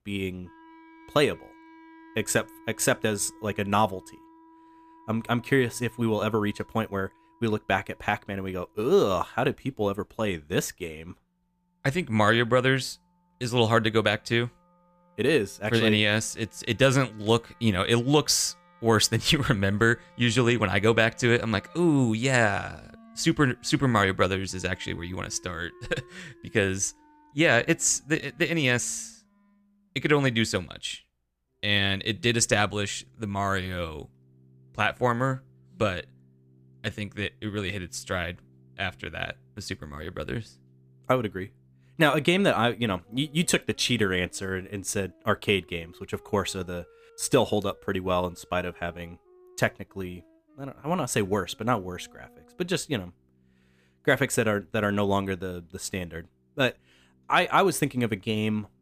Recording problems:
background music; faint; throughout; 30 dB below the speech

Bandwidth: 15 kHz